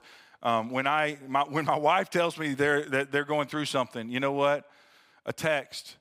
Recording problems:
none

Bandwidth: 15.5 kHz